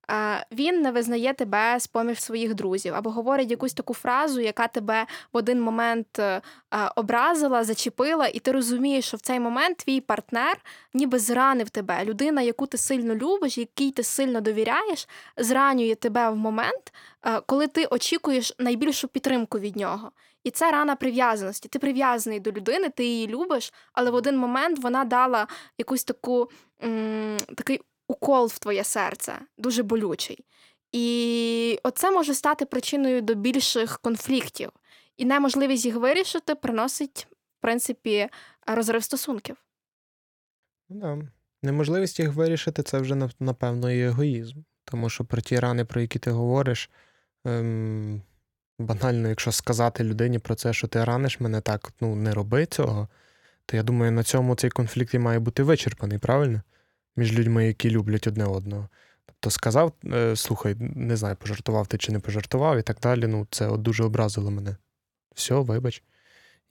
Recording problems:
none

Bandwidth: 17 kHz